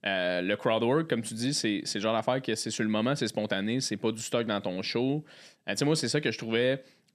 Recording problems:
none

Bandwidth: 13.5 kHz